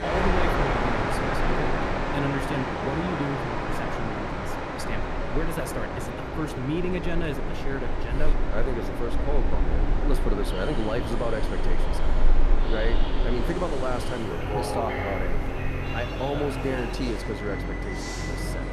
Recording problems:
train or aircraft noise; very loud; throughout; 3 dB above the speech

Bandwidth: 13.5 kHz